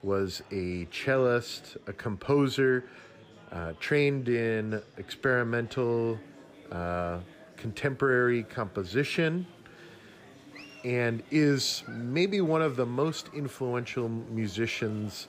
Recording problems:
murmuring crowd; faint; throughout; 20 dB below the speech

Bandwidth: 15 kHz